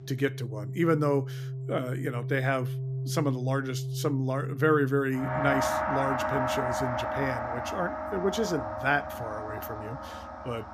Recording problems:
background music; loud; throughout; 3 dB below the speech

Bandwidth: 14.5 kHz